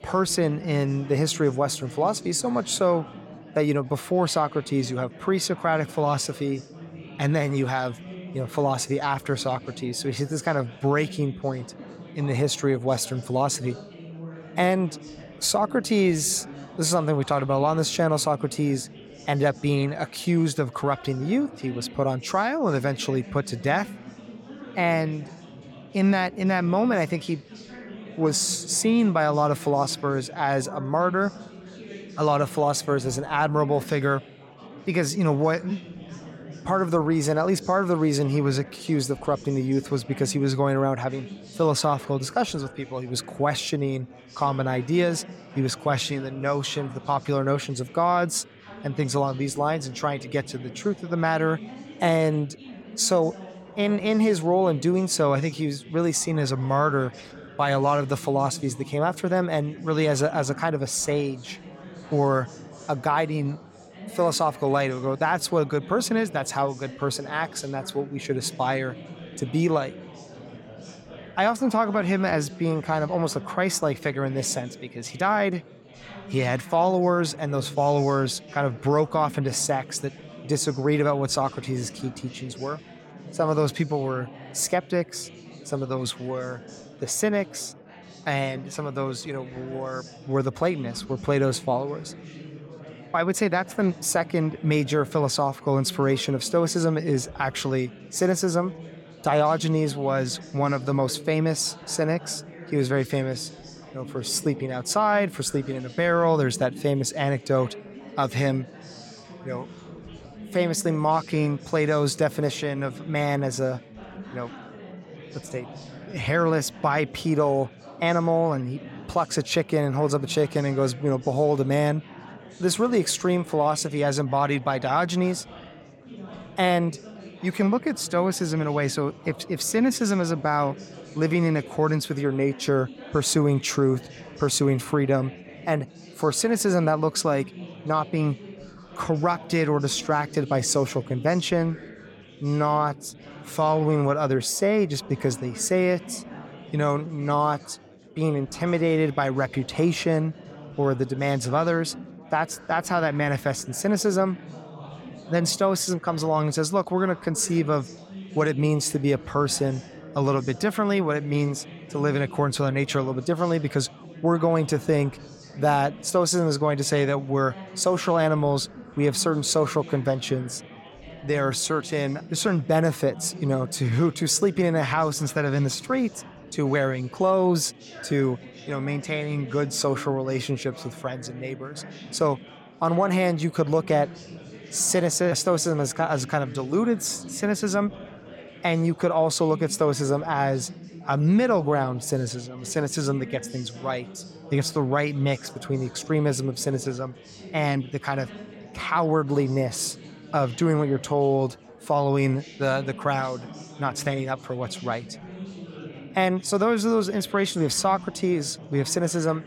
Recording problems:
chatter from many people; noticeable; throughout; 15 dB below the speech

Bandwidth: 17 kHz